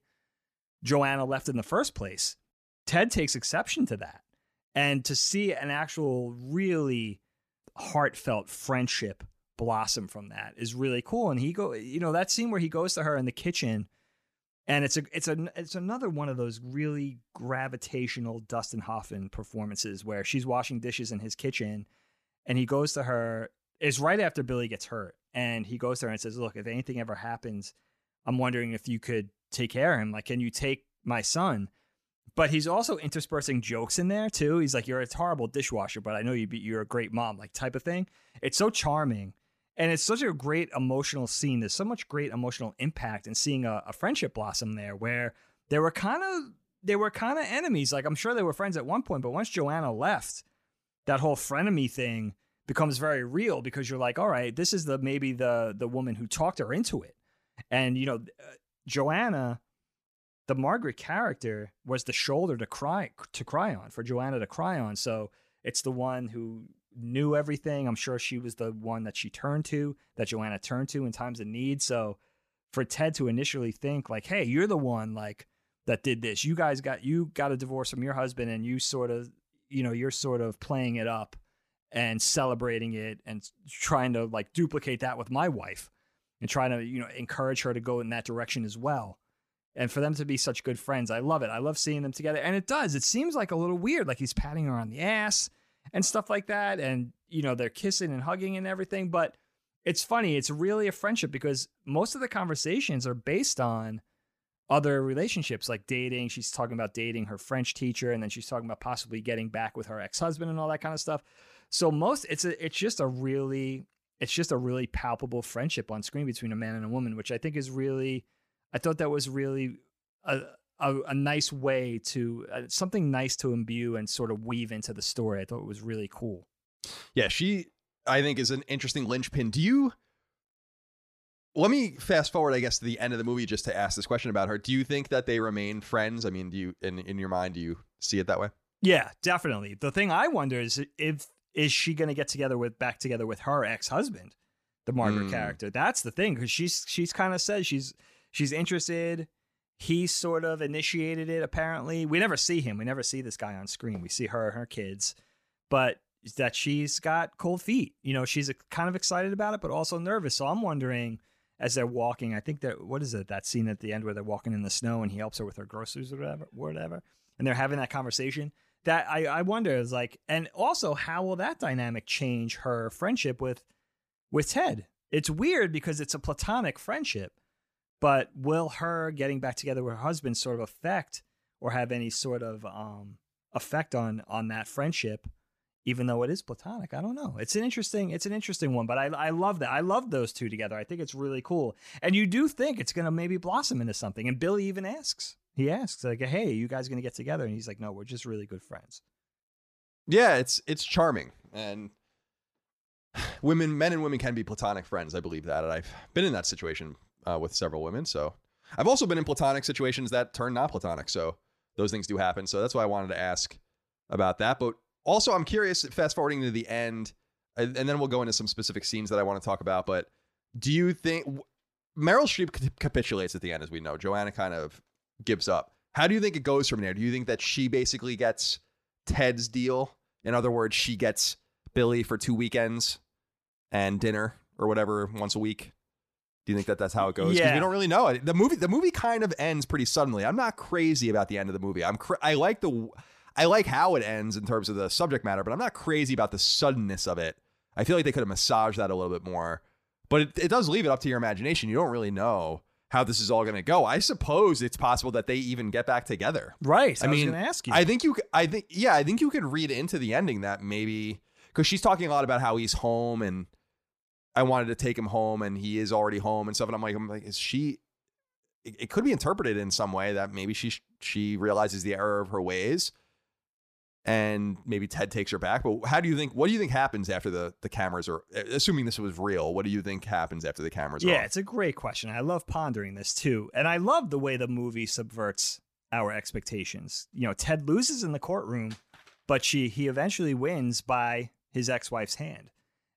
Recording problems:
none

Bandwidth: 14.5 kHz